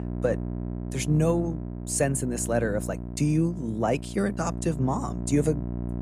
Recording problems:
electrical hum; noticeable; throughout; 60 Hz, 10 dB below the speech

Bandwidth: 14.5 kHz